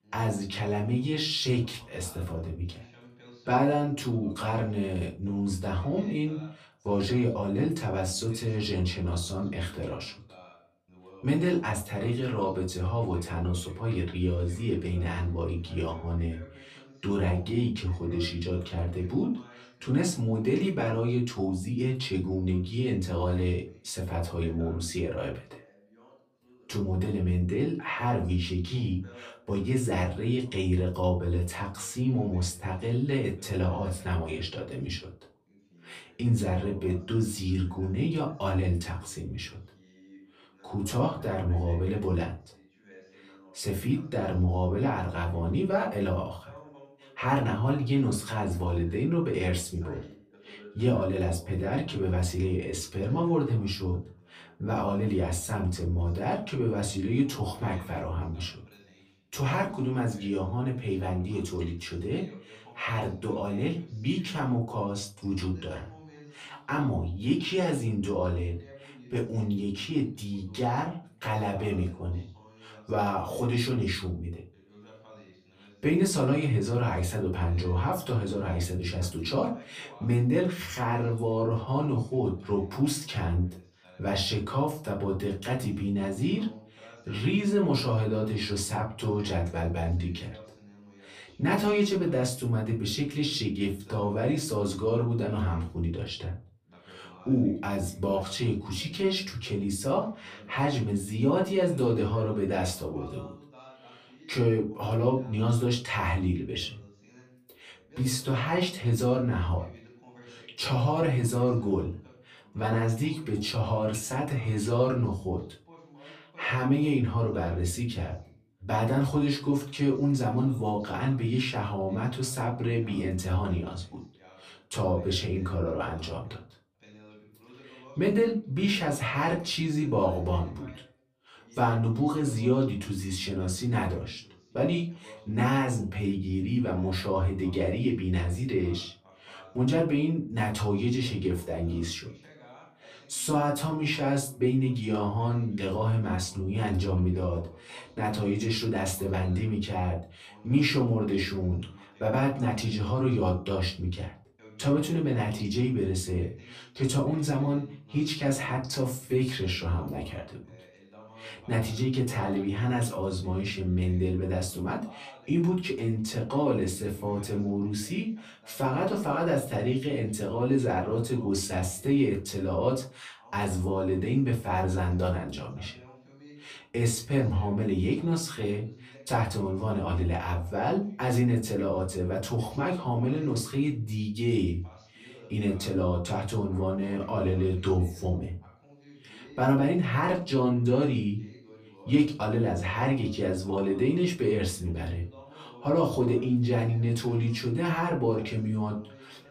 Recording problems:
off-mic speech; far
room echo; very slight; dies away in 0.3 s
voice in the background; faint; throughout; 25 dB below the speech

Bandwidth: 15 kHz